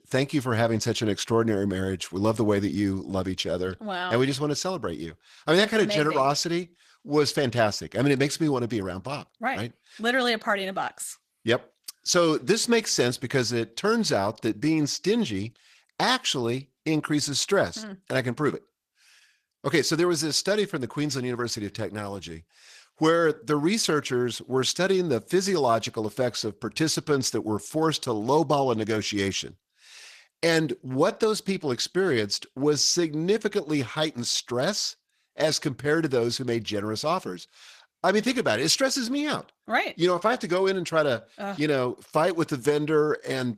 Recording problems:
garbled, watery; slightly; nothing above 14.5 kHz

